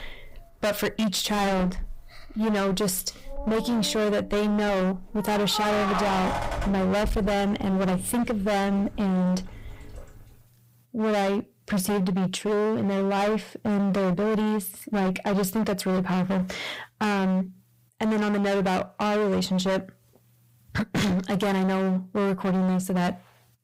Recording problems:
distortion; heavy; 30% of the sound clipped
household noises; loud; until 10 s; 8 dB below the speech

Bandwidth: 15.5 kHz